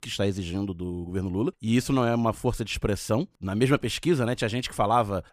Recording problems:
none

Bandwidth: 15 kHz